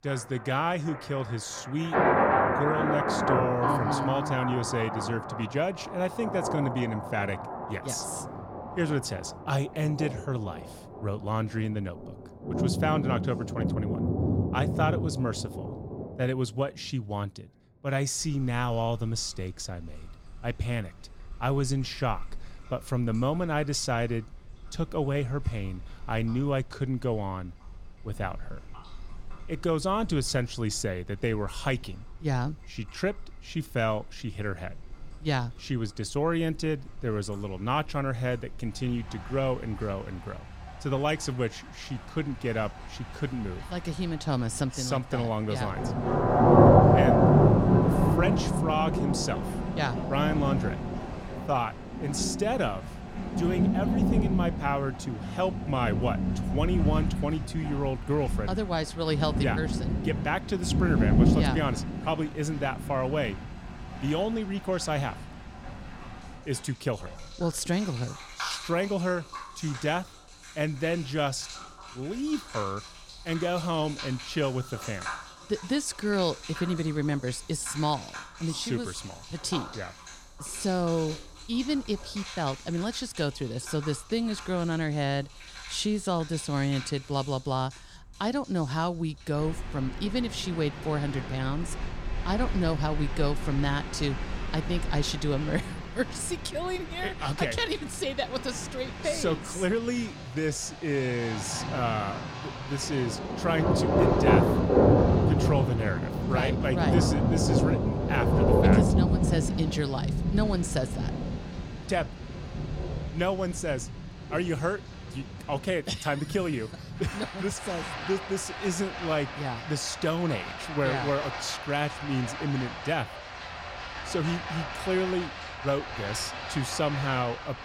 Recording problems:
rain or running water; very loud; throughout; 2 dB above the speech

